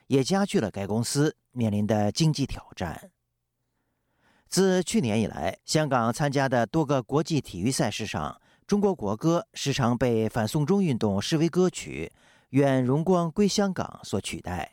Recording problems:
none

